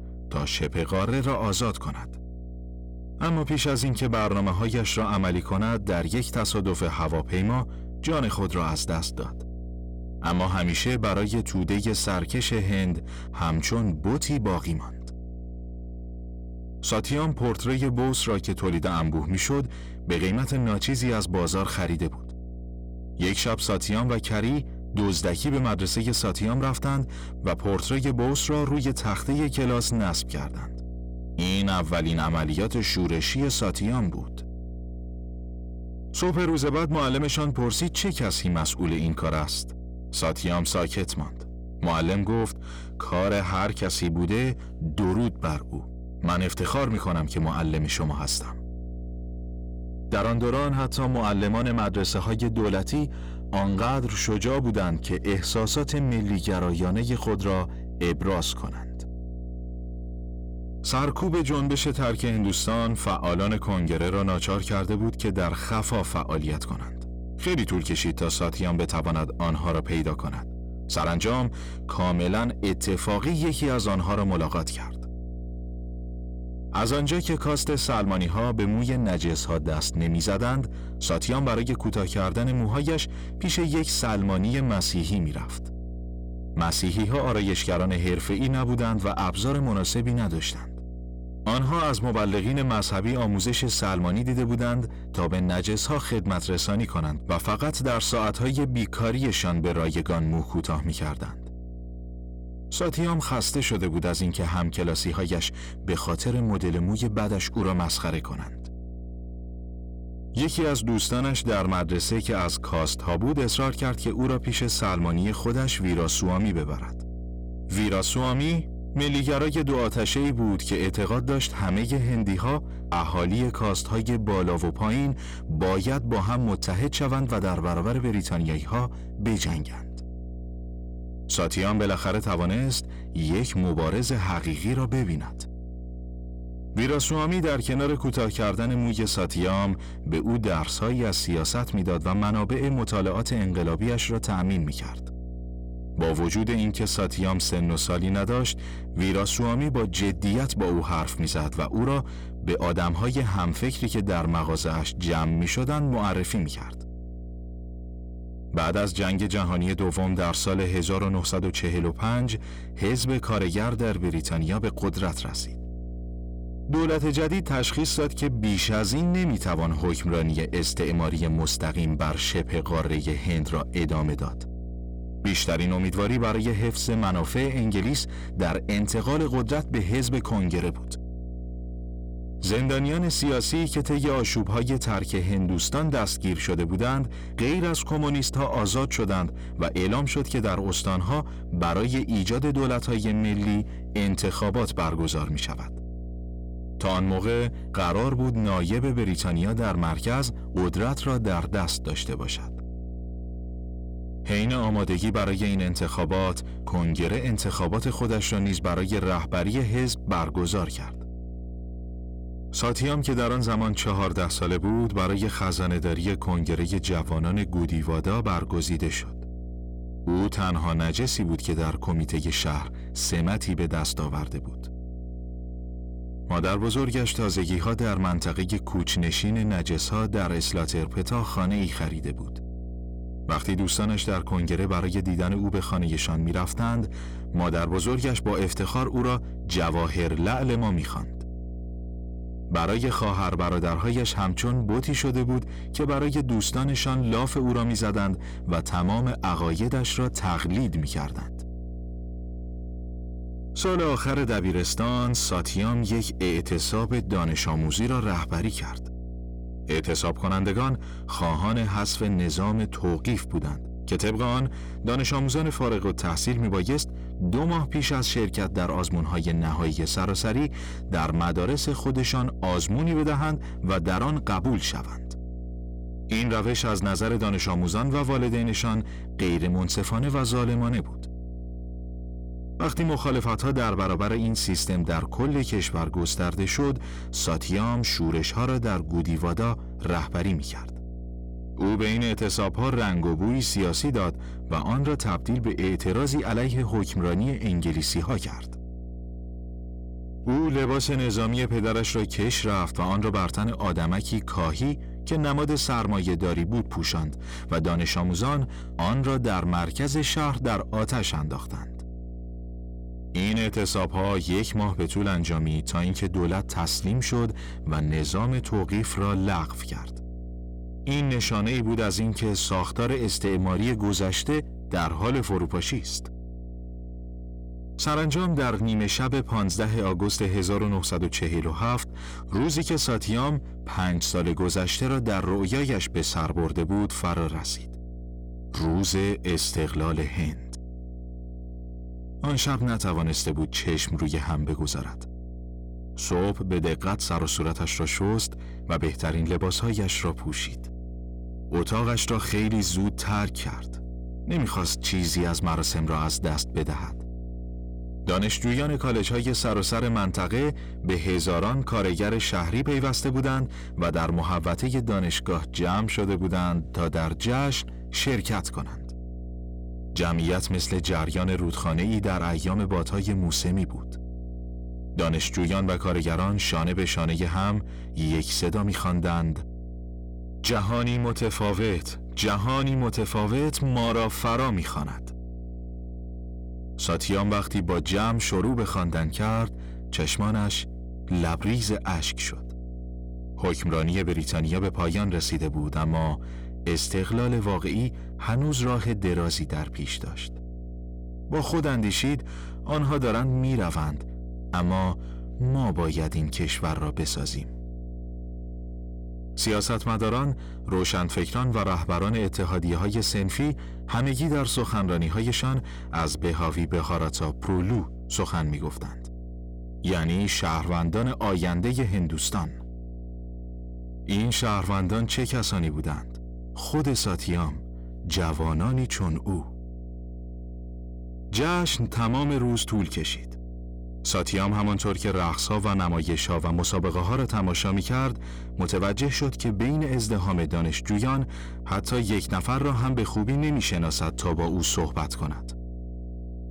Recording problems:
distortion; slight; 10 dB below the speech
electrical hum; faint; throughout; 60 Hz, 20 dB below the speech

